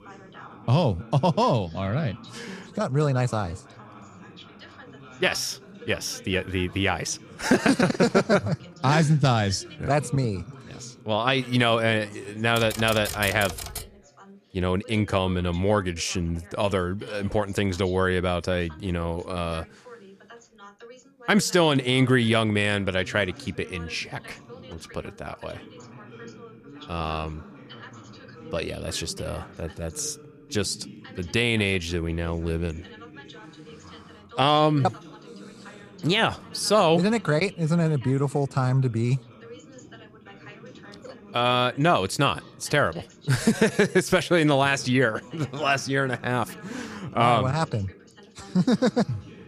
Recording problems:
background chatter; faint; throughout; 2 voices, 20 dB below the speech
keyboard typing; noticeable; from 13 to 14 s; peak 7 dB below the speech

